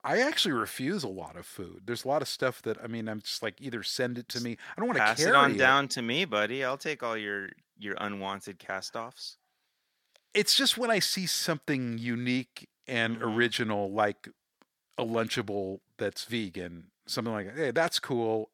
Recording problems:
thin; somewhat; fading below 500 Hz

